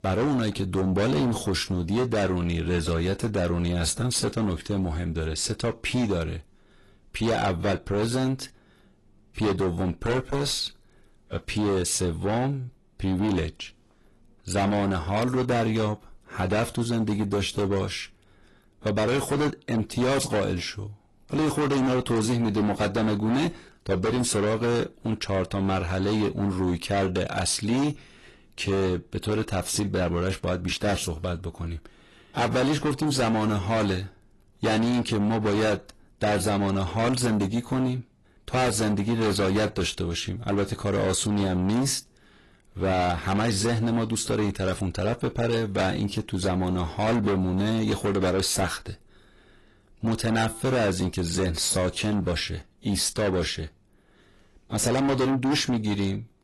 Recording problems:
distortion; heavy; 7 dB below the speech
garbled, watery; slightly; nothing above 11.5 kHz

